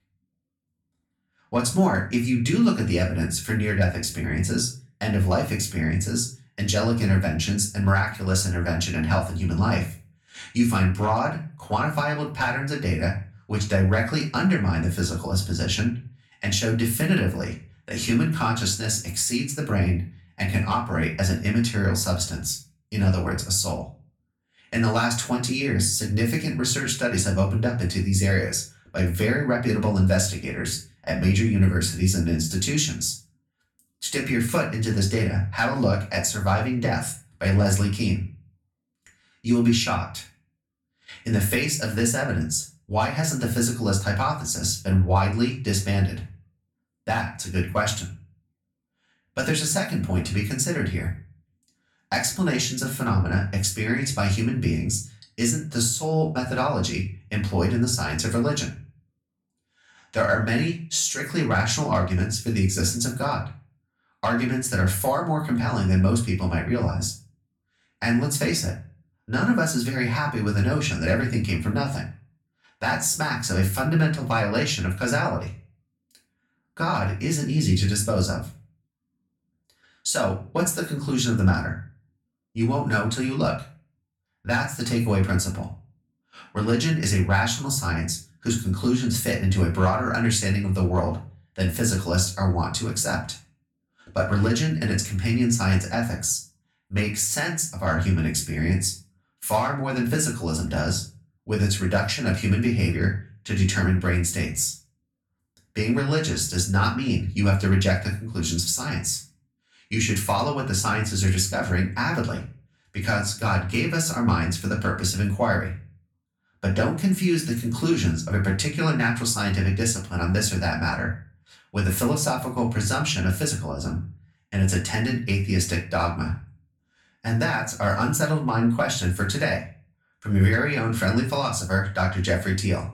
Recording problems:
off-mic speech; far
room echo; very slight; dies away in 0.3 s

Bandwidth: 17 kHz